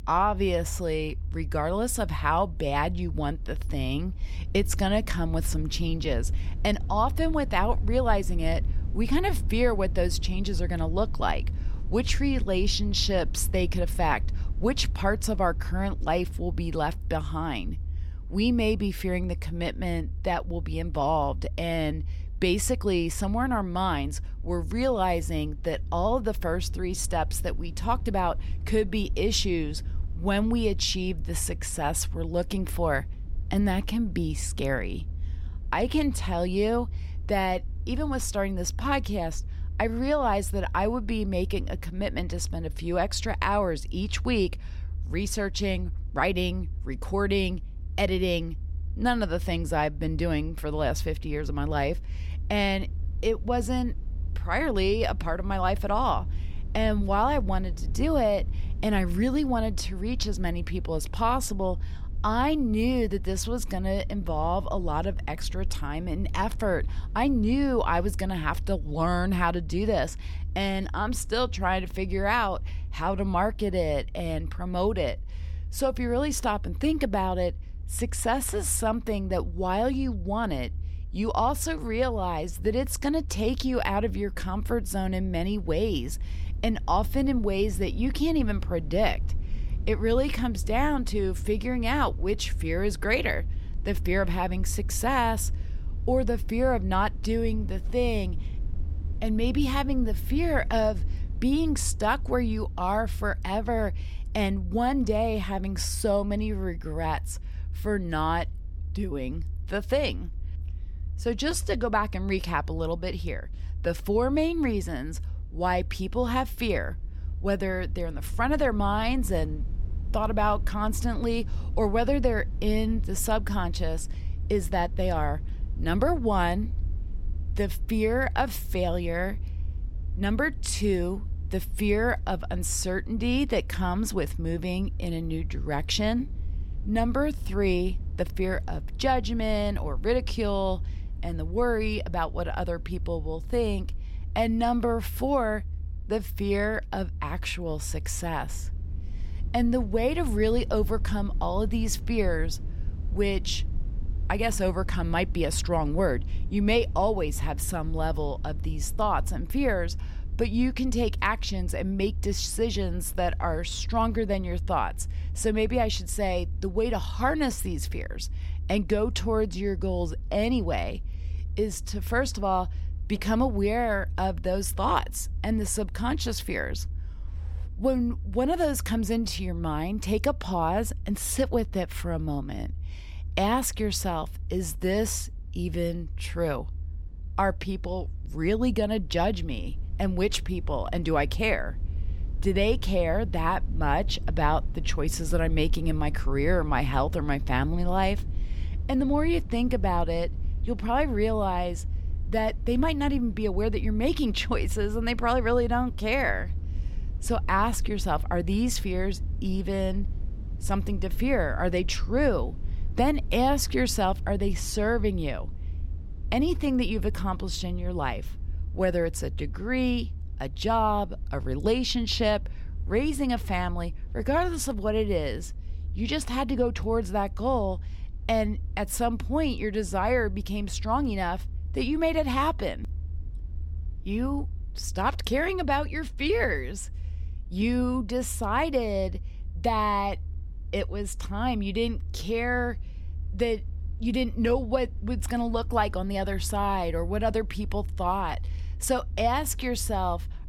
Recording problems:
low rumble; faint; throughout; 25 dB below the speech

